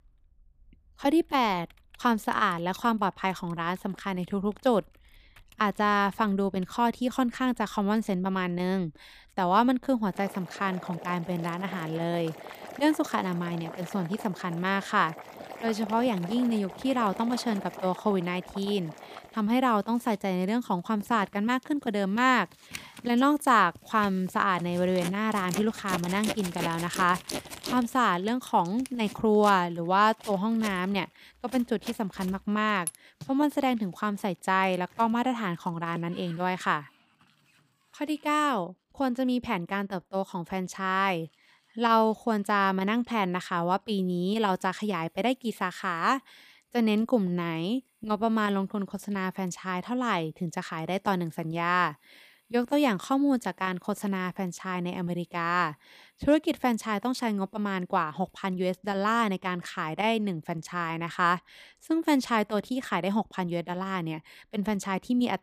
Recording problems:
household noises; noticeable; throughout; 15 dB below the speech

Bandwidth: 15 kHz